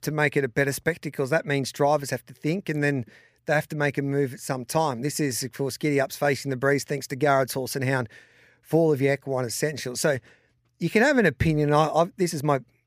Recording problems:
none

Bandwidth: 15 kHz